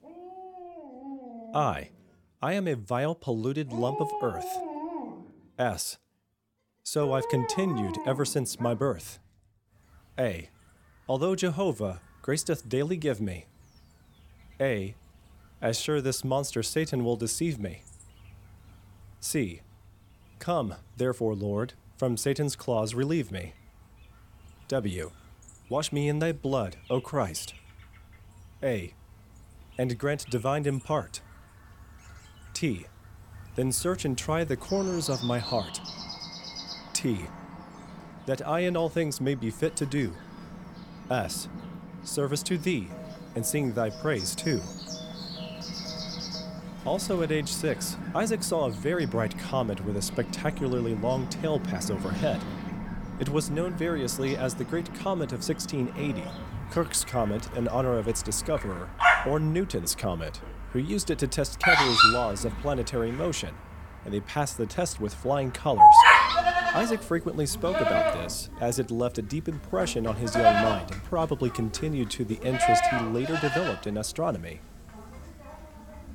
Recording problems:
animal sounds; very loud; throughout; 3 dB above the speech
phone ringing; faint; from 43 to 47 s; peak 15 dB below the speech

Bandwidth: 17 kHz